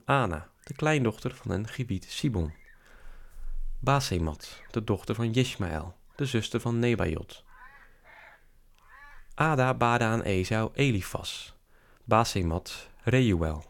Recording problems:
animal sounds; faint; throughout; 25 dB below the speech

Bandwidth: 17.5 kHz